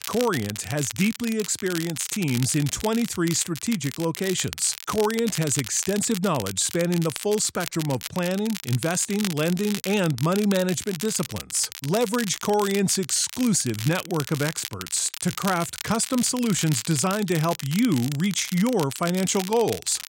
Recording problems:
crackle, like an old record; noticeable; 10 dB below the speech

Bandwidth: 16 kHz